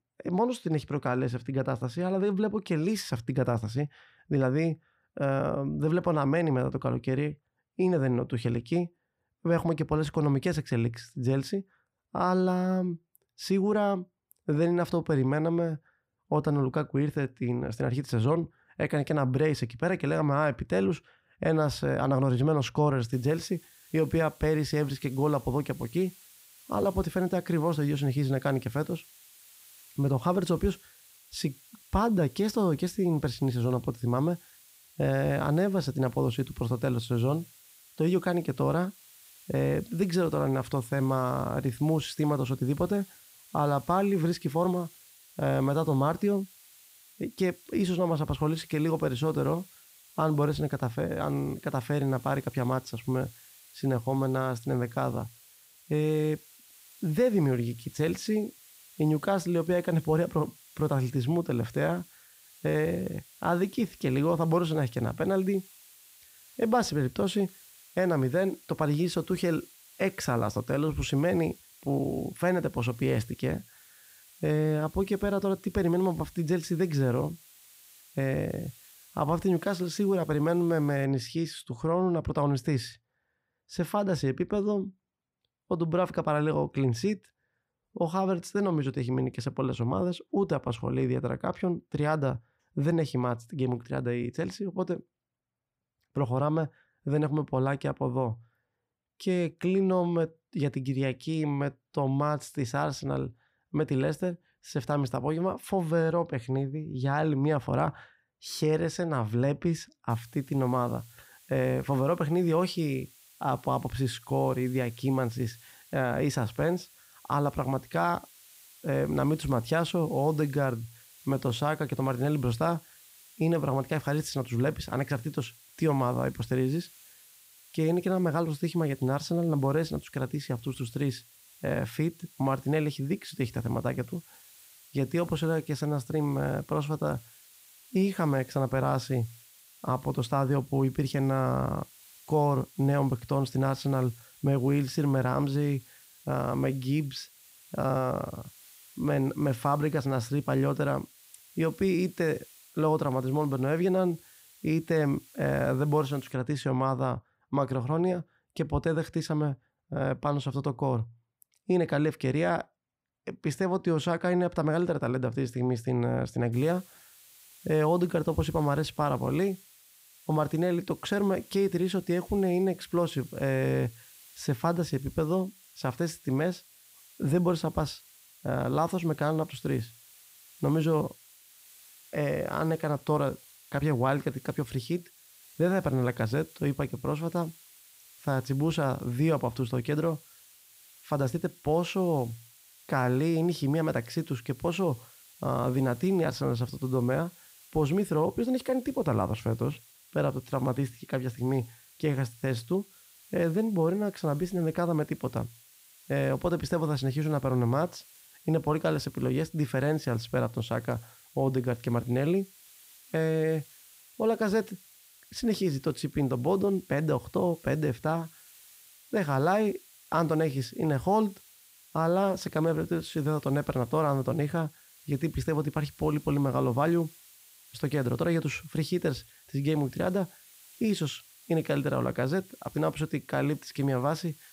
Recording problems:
hiss; faint; from 23 s to 1:21, from 1:50 to 2:36 and from 2:47 on; 25 dB below the speech

